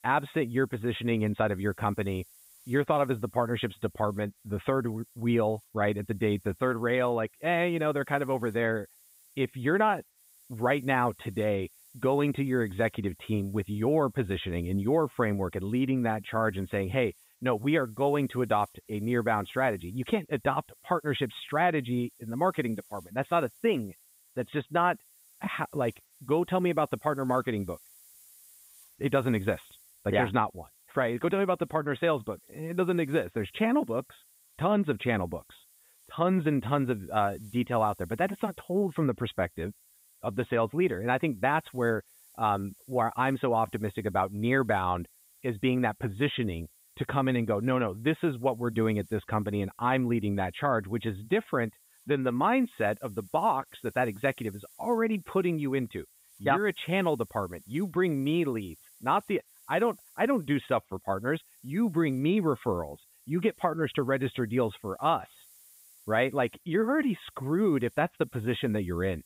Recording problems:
high frequencies cut off; severe; nothing above 4 kHz
hiss; faint; throughout; 25 dB below the speech

